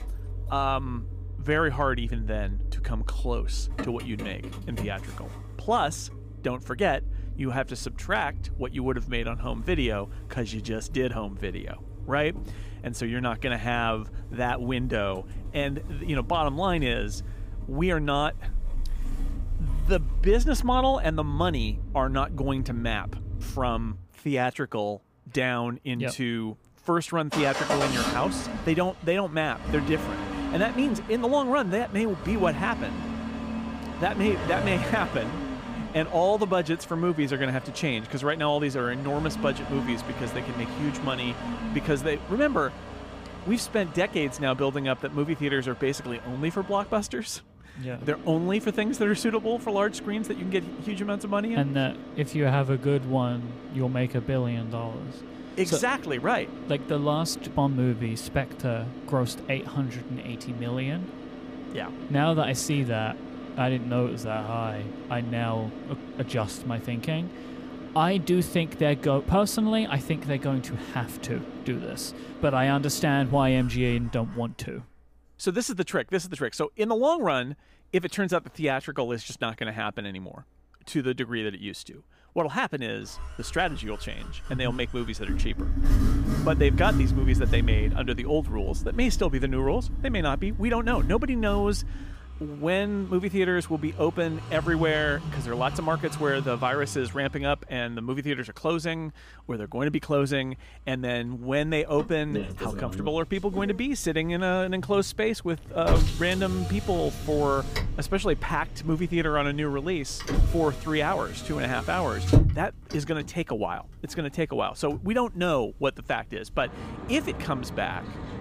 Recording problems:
traffic noise; loud; throughout; 7 dB below the speech

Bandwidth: 15 kHz